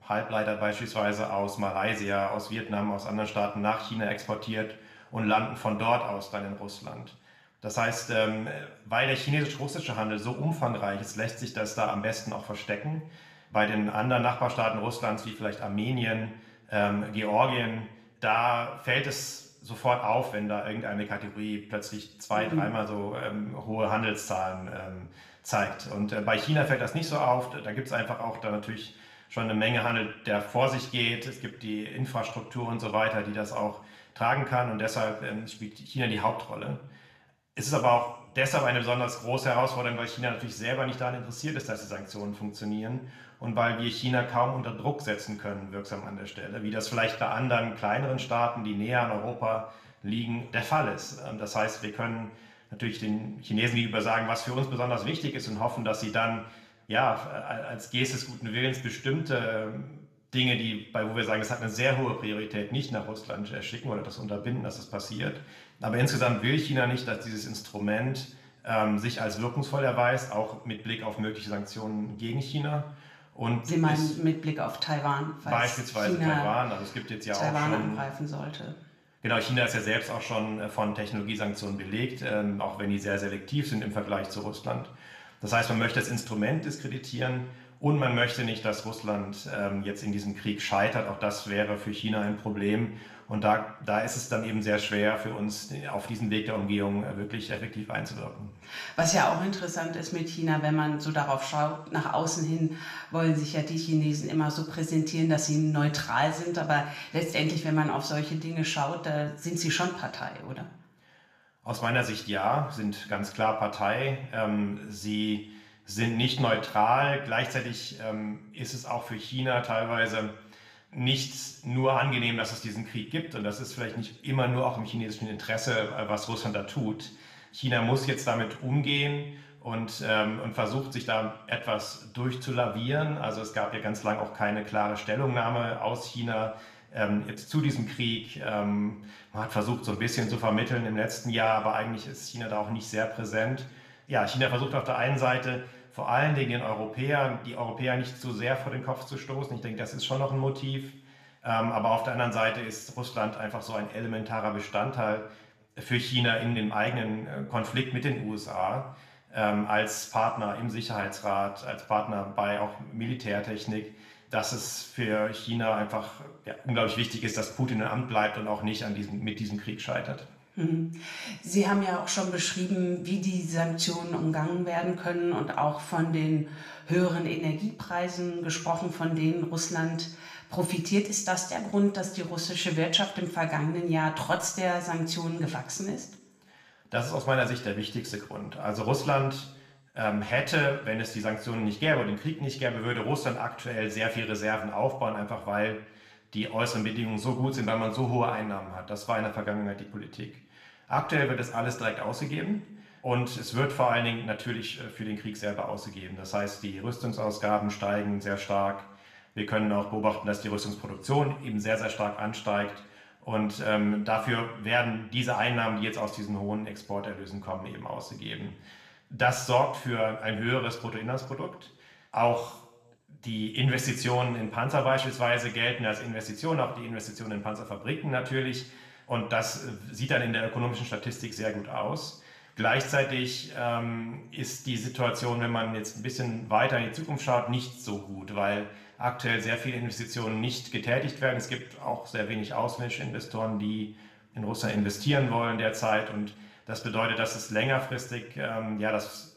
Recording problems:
room echo; slight; dies away in 0.7 s
off-mic speech; somewhat distant

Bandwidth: 14.5 kHz